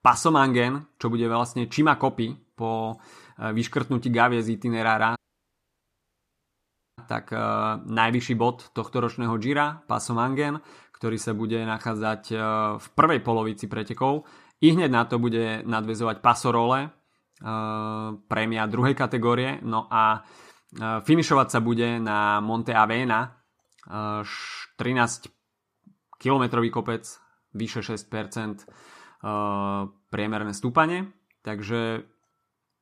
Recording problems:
audio cutting out; at 5 s for 2 s

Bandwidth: 14.5 kHz